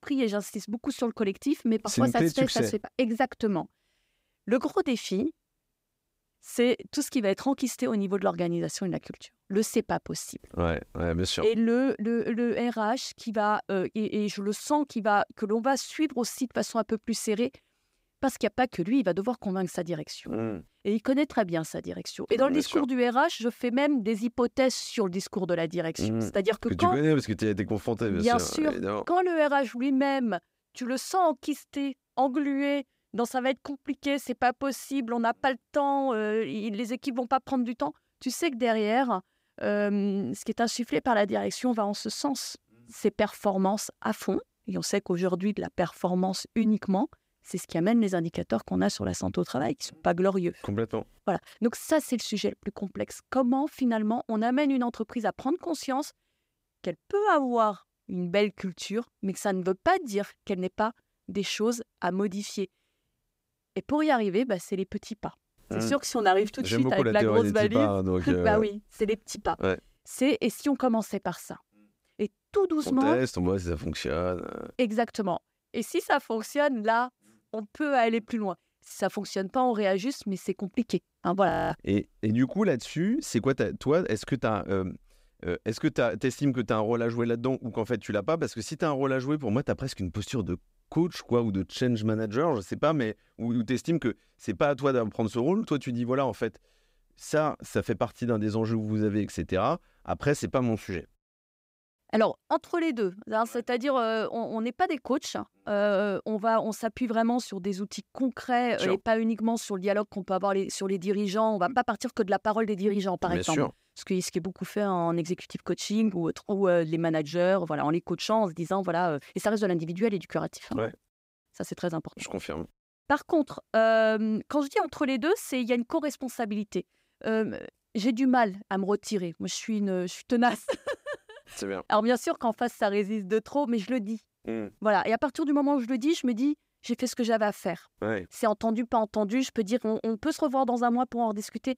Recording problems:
audio freezing; at 1:21

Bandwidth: 15.5 kHz